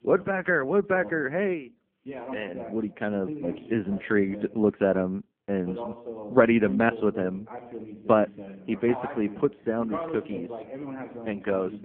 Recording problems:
phone-call audio; poor line
voice in the background; noticeable; throughout; 10 dB below the speech

